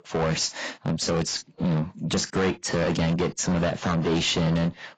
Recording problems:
distortion; heavy; 6 dB below the speech
garbled, watery; badly; nothing above 7.5 kHz

